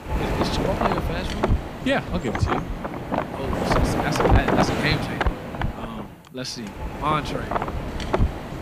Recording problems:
wind noise on the microphone; heavy; 3 dB above the speech

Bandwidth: 15 kHz